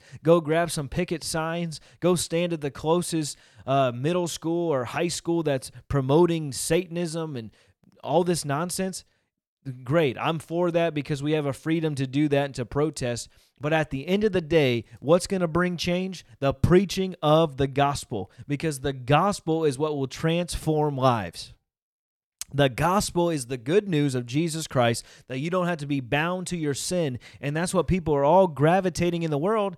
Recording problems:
none

